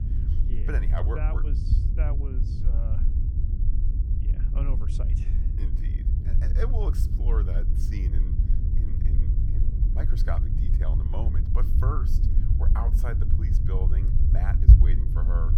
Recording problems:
low rumble; loud; throughout; 2 dB below the speech

